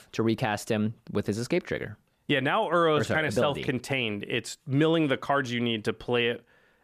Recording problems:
none

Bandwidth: 14.5 kHz